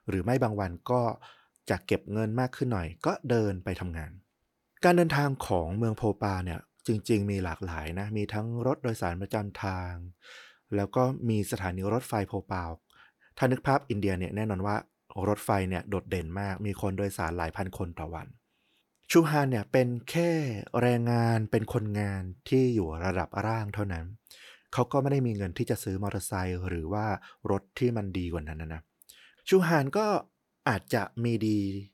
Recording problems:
none

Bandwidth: 18.5 kHz